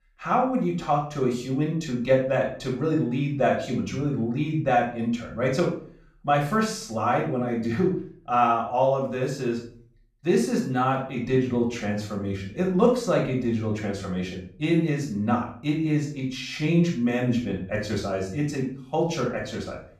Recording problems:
off-mic speech; far
room echo; noticeable; dies away in 0.4 s

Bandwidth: 14.5 kHz